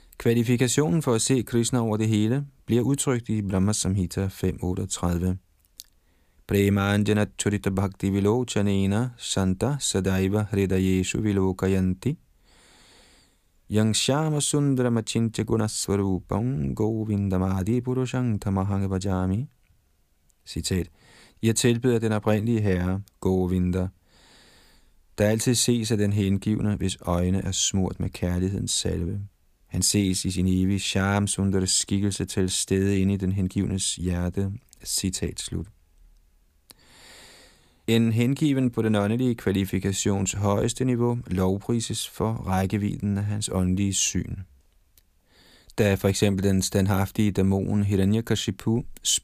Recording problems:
none

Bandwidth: 15 kHz